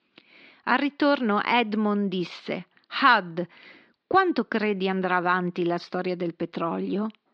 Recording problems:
muffled; very slightly; fading above 4.5 kHz

